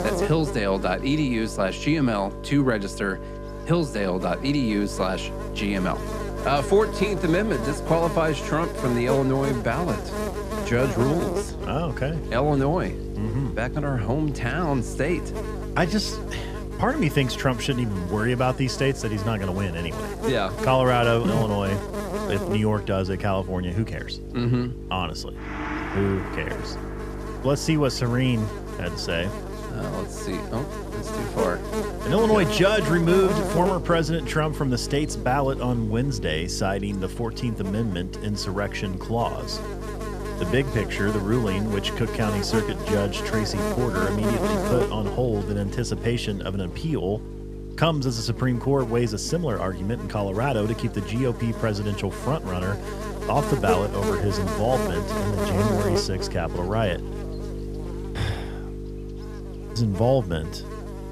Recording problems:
electrical hum; loud; throughout; 50 Hz, 7 dB below the speech
background music; noticeable; throughout; 15 dB below the speech

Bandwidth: 14.5 kHz